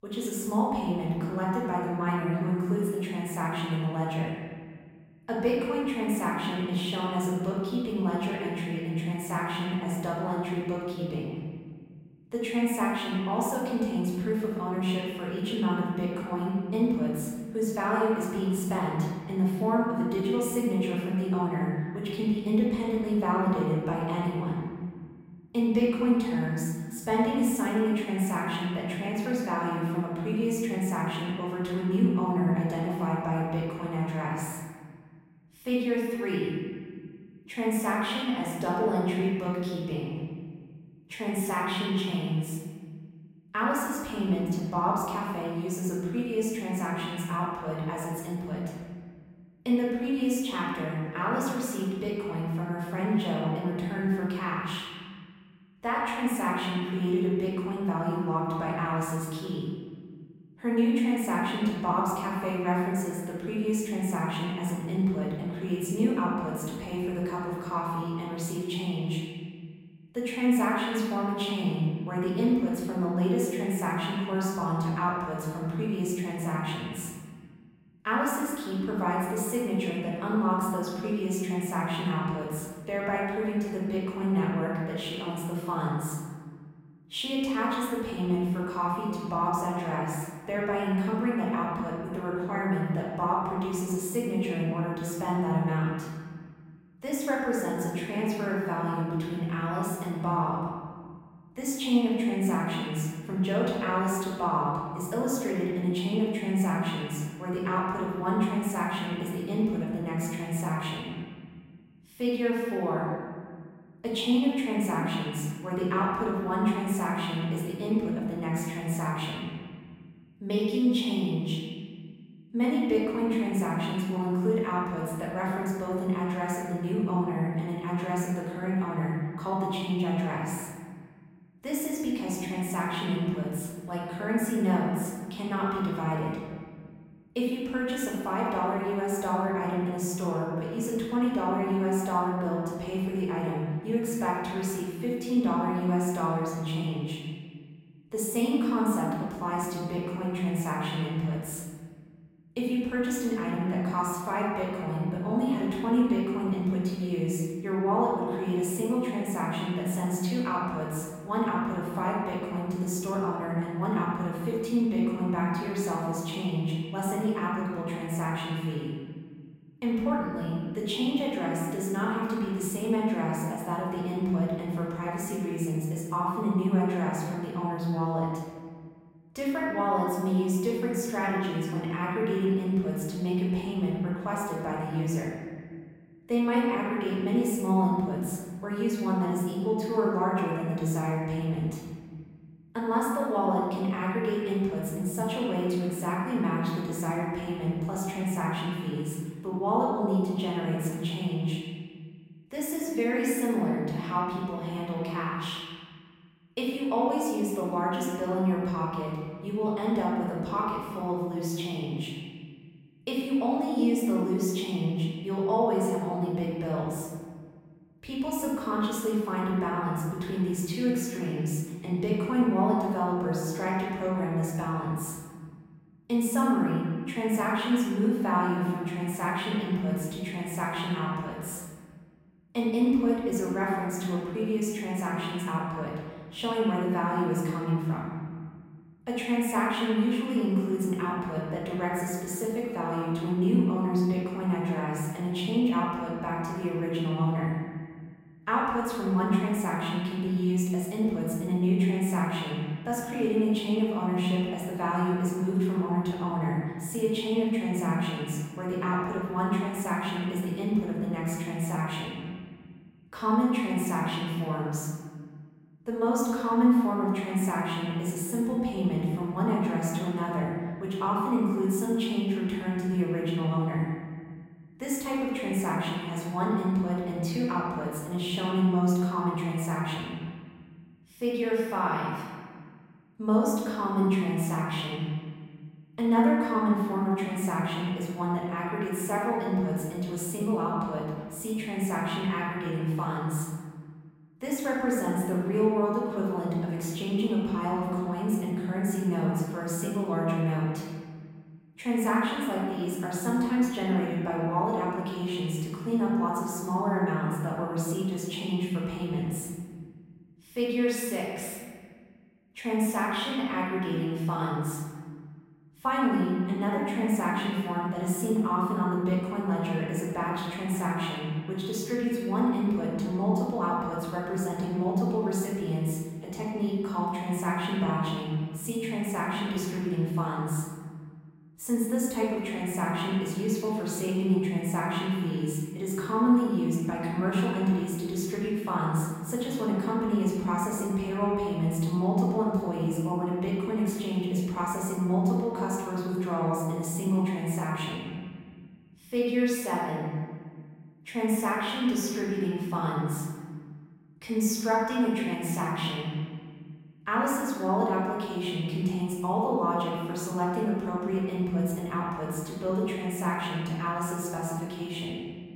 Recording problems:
off-mic speech; far
room echo; noticeable; dies away in 1.8 s

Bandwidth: 16 kHz